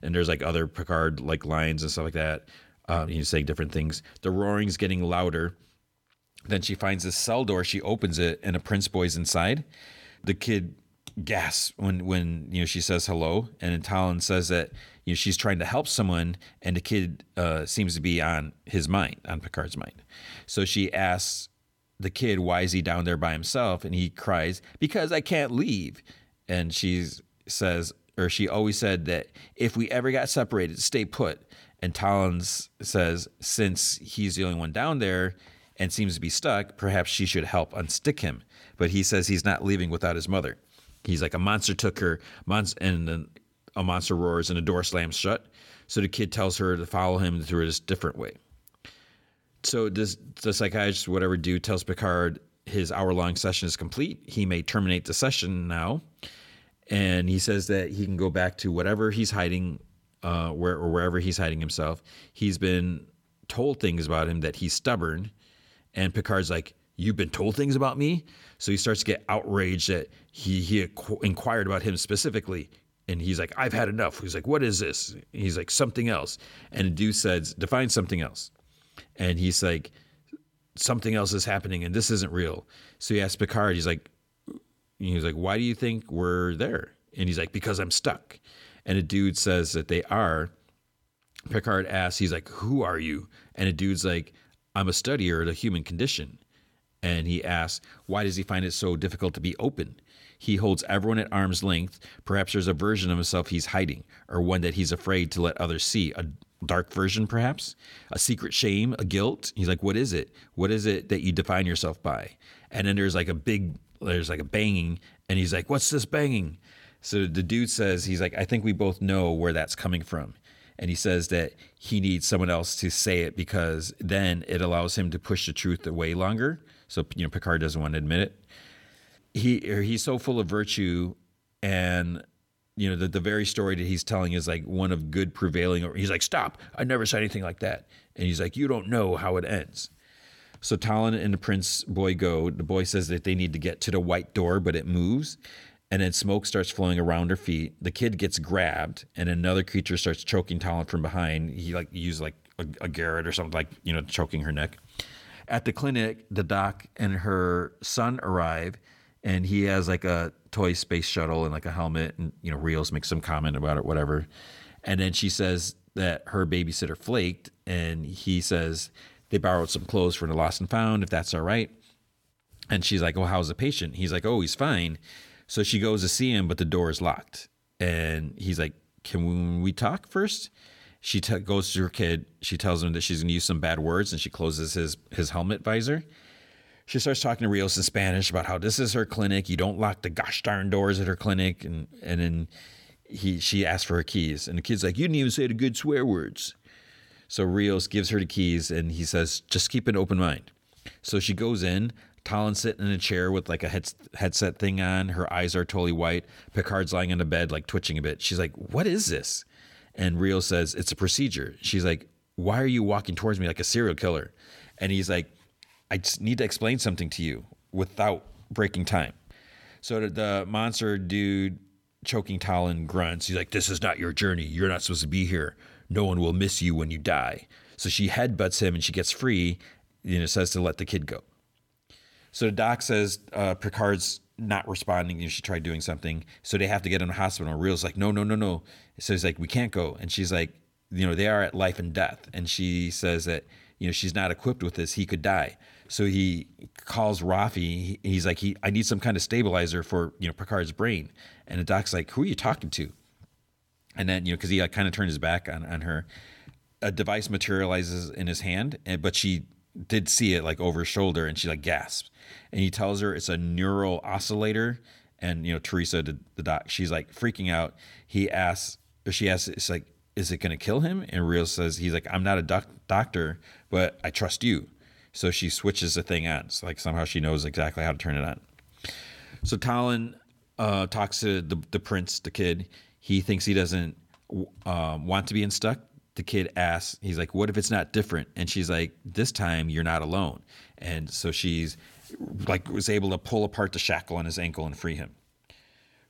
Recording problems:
none

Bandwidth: 17 kHz